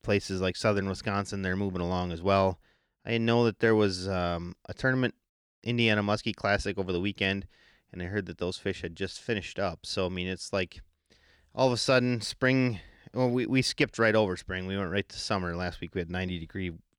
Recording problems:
none

